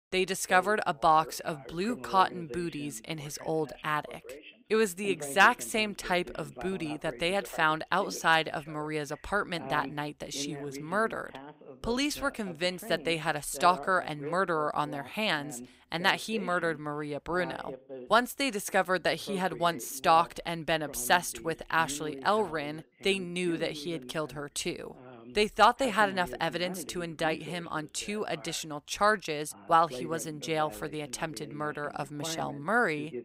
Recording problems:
voice in the background; noticeable; throughout; 15 dB below the speech

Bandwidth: 15.5 kHz